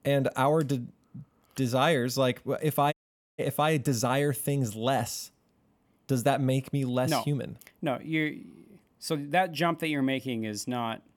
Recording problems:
audio cutting out; at 3 s

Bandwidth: 18.5 kHz